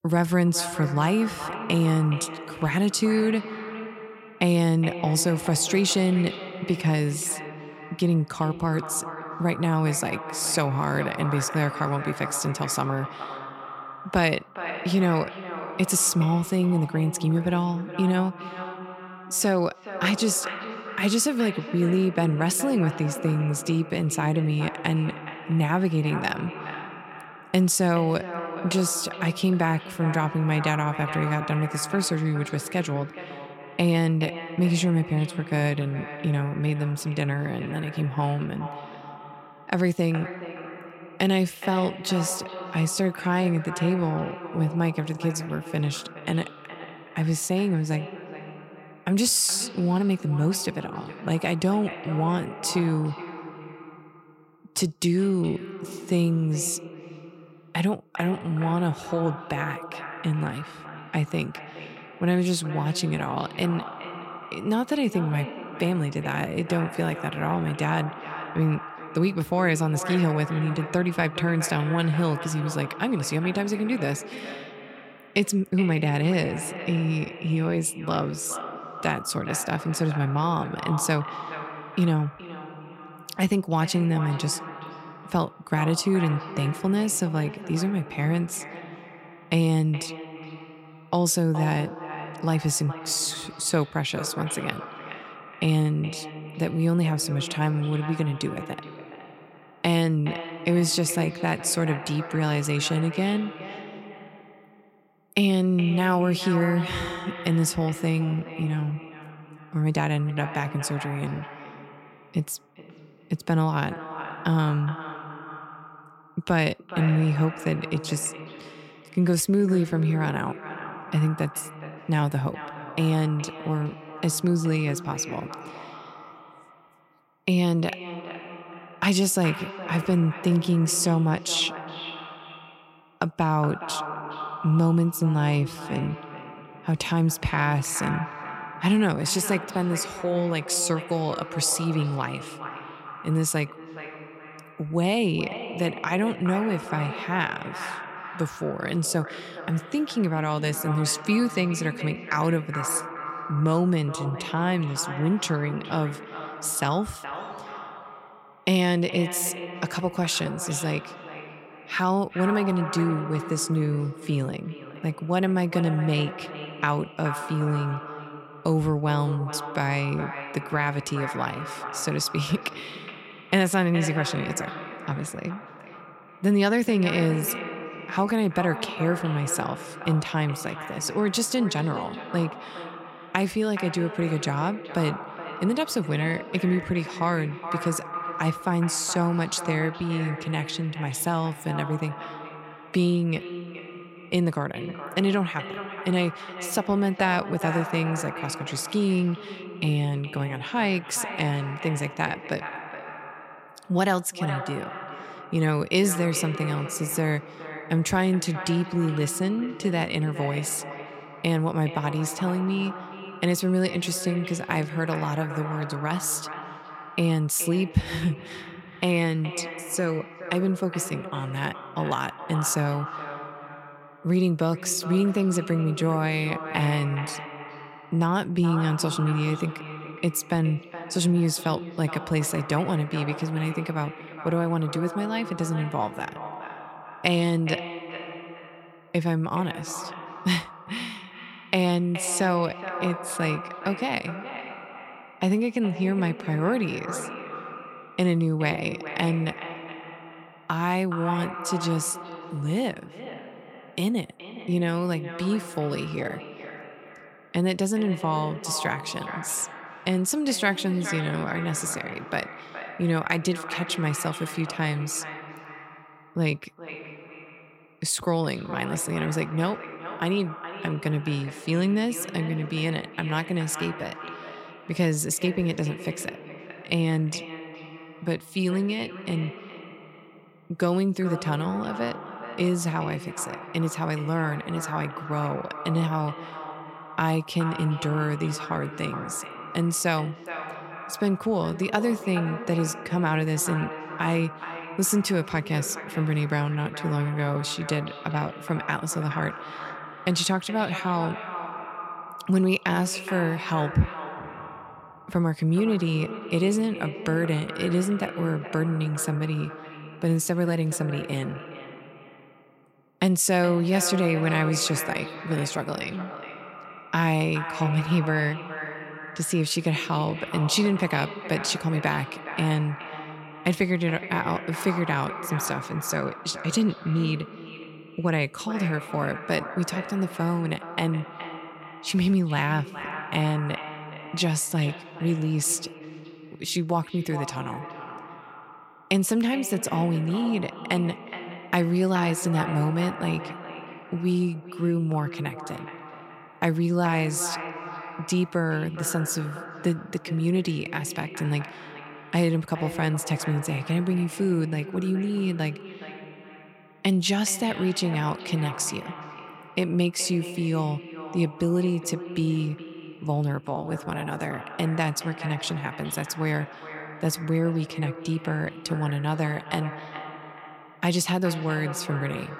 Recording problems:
echo of what is said; strong; throughout; 420 ms later, 10 dB below the speech

